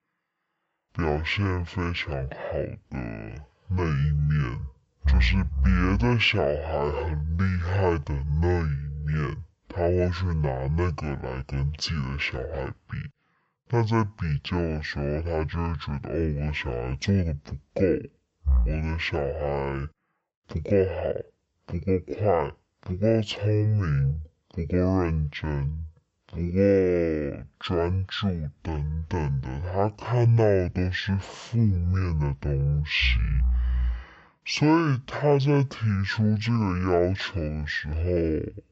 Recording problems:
wrong speed and pitch; too slow and too low; 0.5 times normal speed

